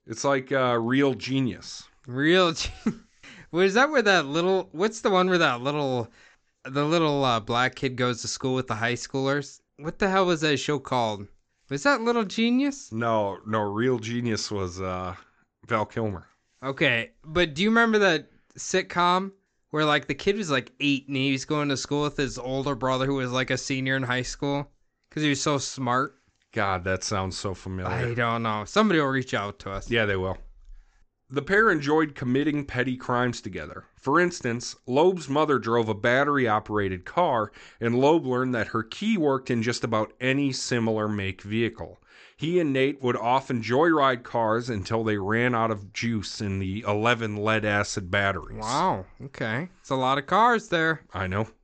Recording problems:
high frequencies cut off; noticeable; nothing above 8 kHz

